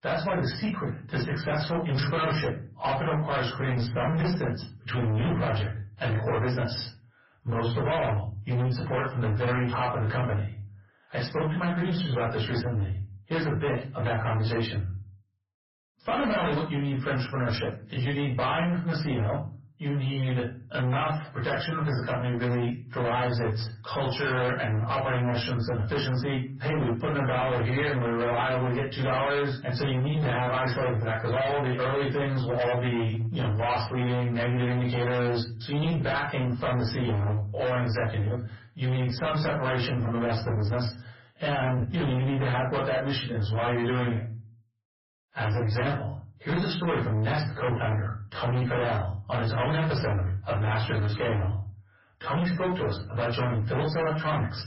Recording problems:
distortion; heavy; 30% of the sound clipped
off-mic speech; far
garbled, watery; badly; nothing above 5.5 kHz
room echo; slight; dies away in 0.3 s

